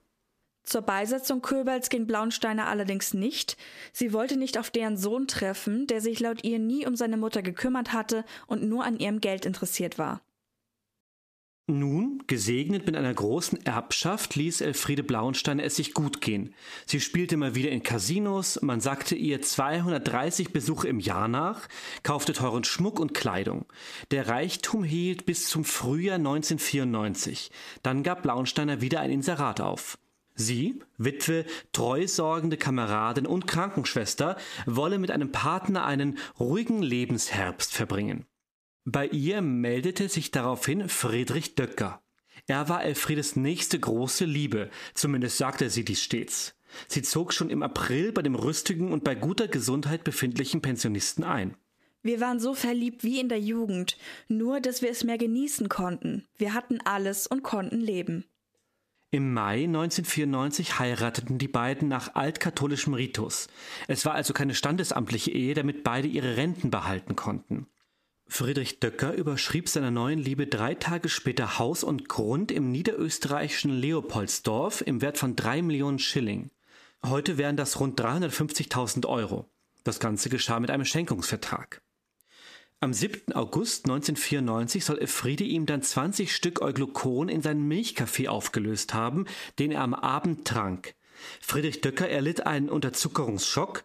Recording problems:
squashed, flat; somewhat

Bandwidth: 14.5 kHz